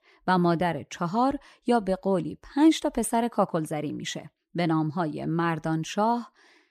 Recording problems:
none

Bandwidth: 14.5 kHz